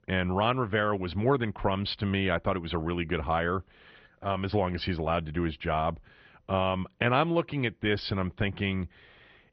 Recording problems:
garbled, watery; slightly; nothing above 5 kHz
muffled; very slightly; fading above 3.5 kHz

